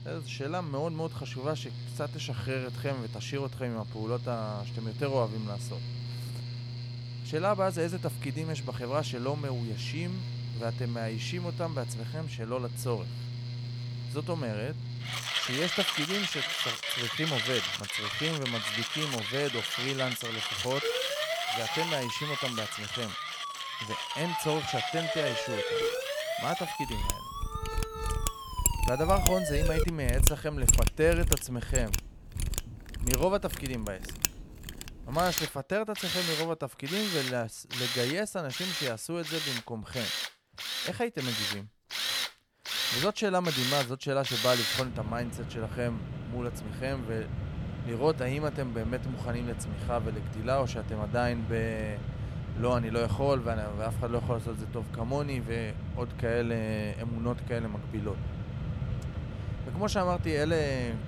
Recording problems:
machinery noise; loud; throughout; 1 dB below the speech
siren; loud; from 21 to 30 s; peak 3 dB above the speech

